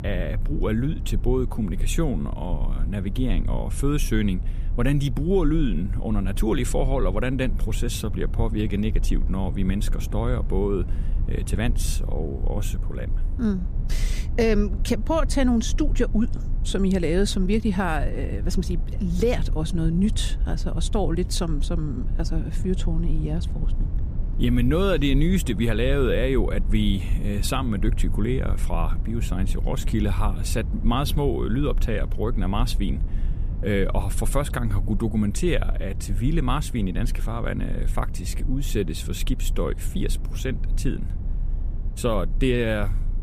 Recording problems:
low rumble; noticeable; throughout; 15 dB below the speech

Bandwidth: 14.5 kHz